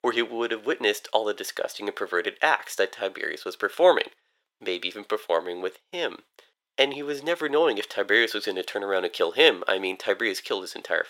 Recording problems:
thin; very; fading below 450 Hz

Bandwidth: 16.5 kHz